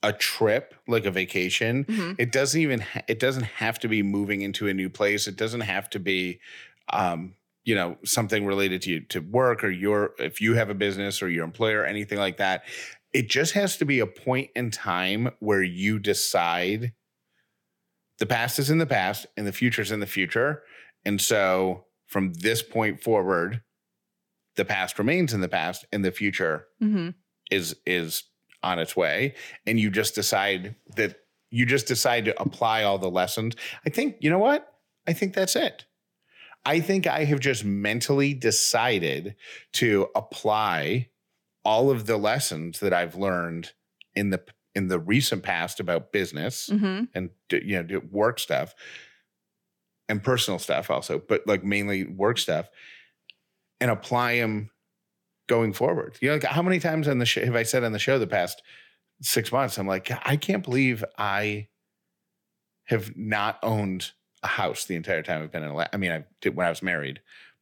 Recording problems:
none

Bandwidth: 18 kHz